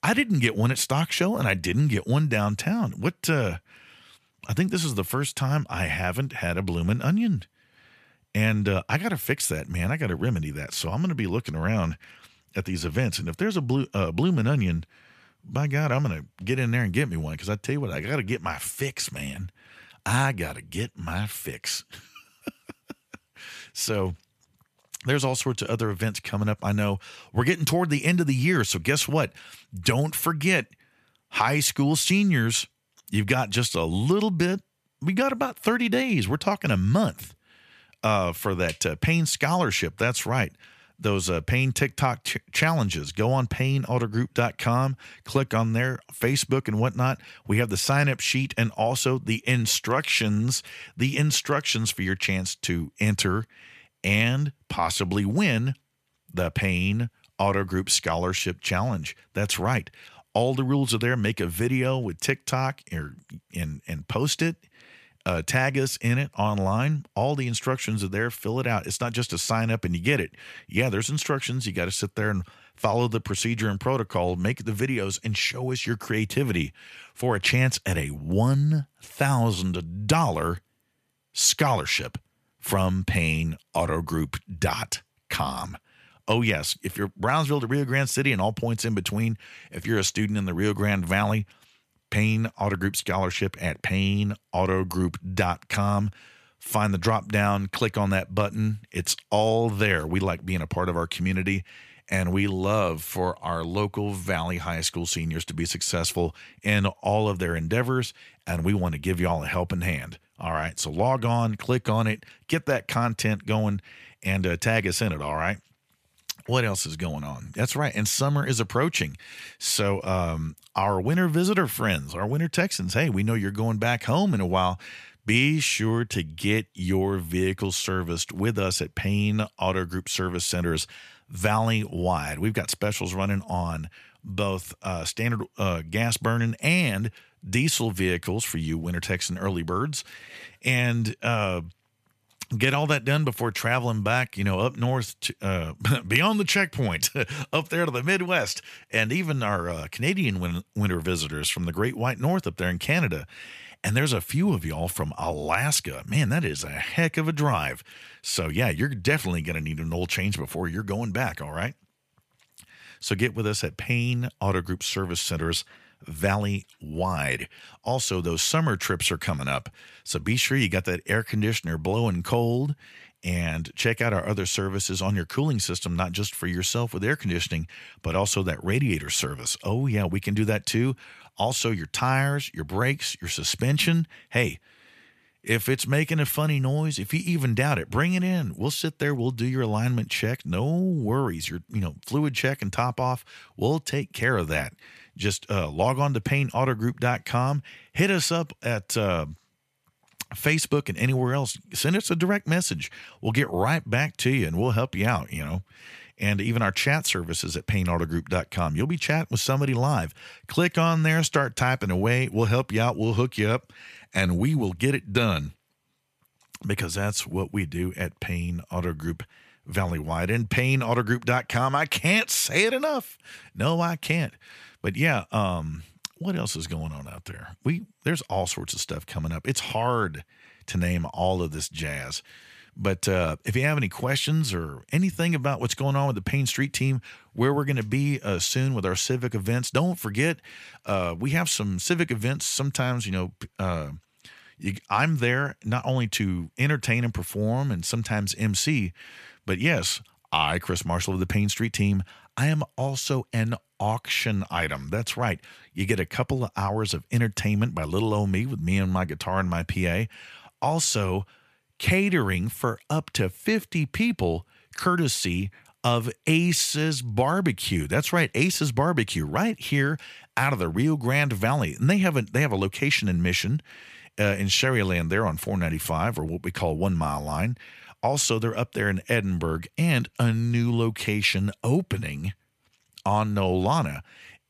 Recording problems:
none

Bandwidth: 14.5 kHz